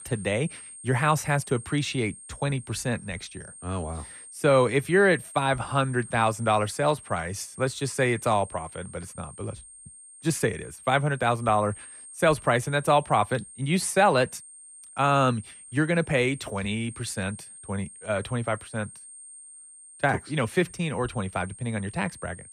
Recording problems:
high-pitched whine; noticeable; throughout; 8.5 kHz, 15 dB below the speech

